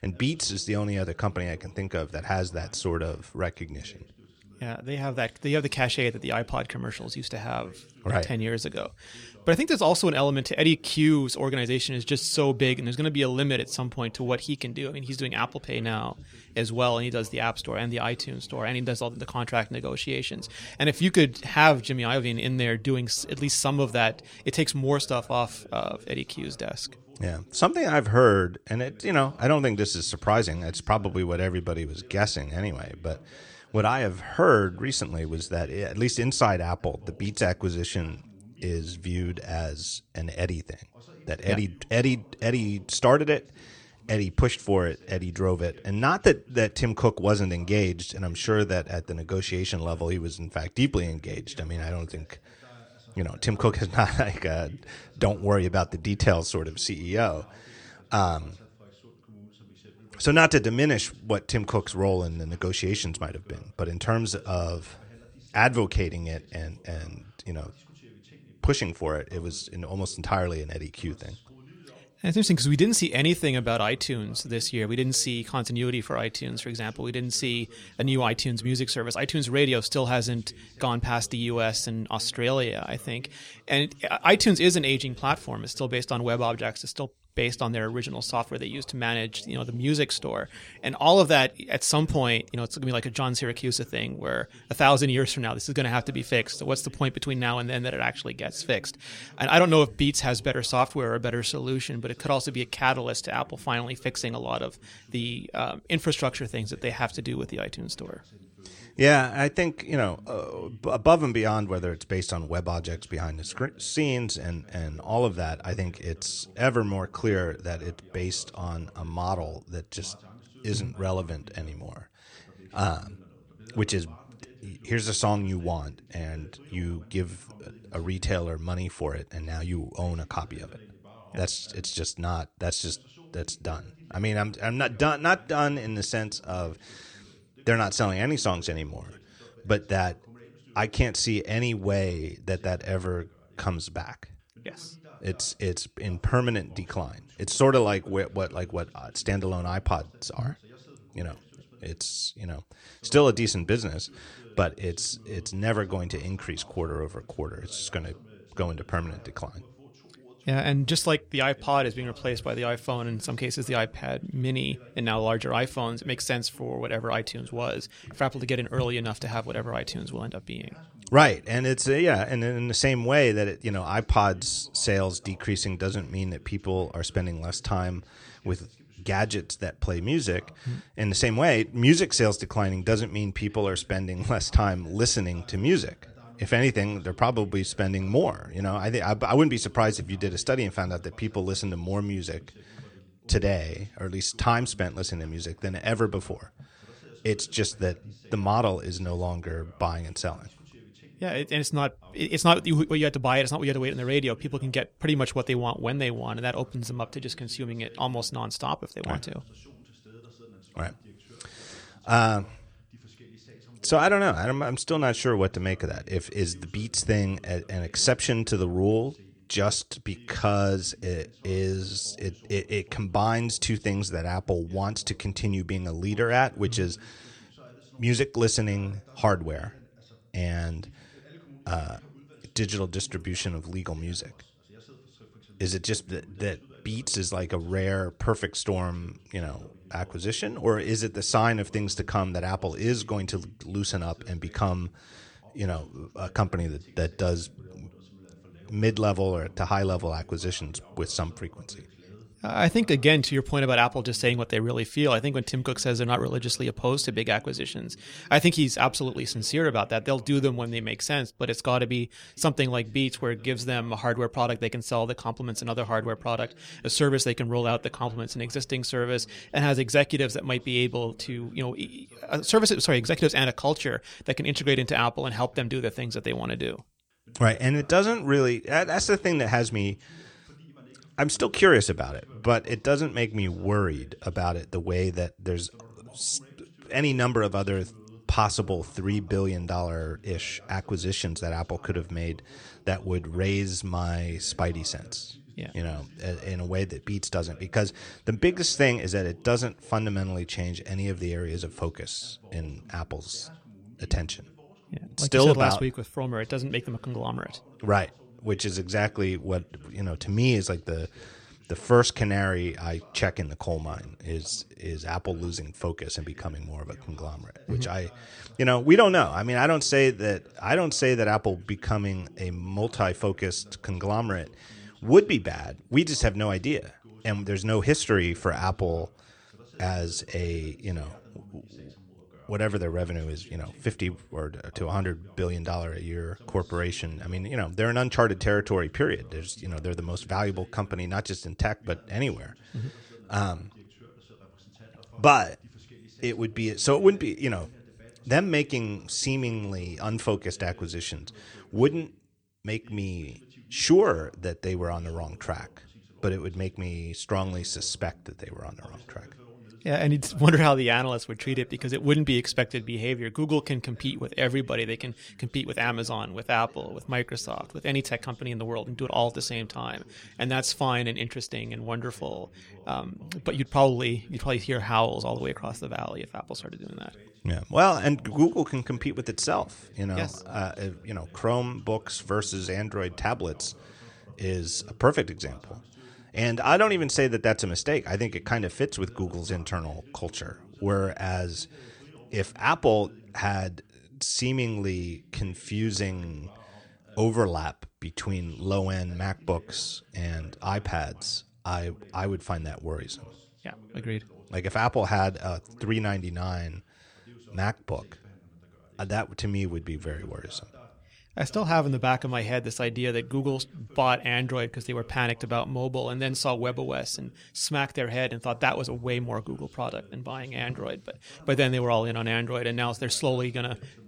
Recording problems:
voice in the background; faint; throughout; 25 dB below the speech

